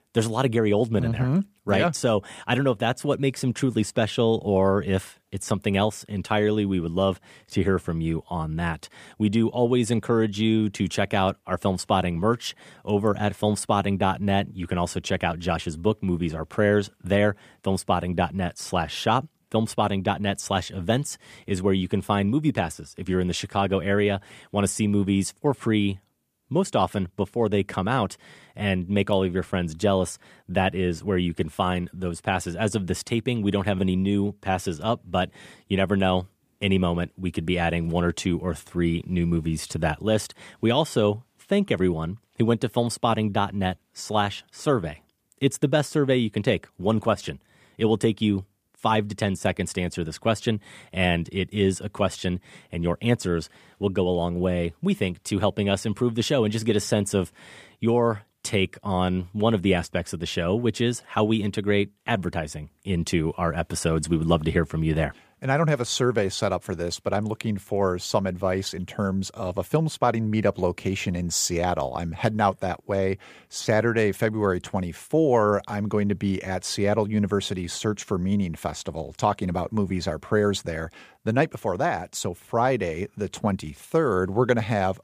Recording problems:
none

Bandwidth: 15 kHz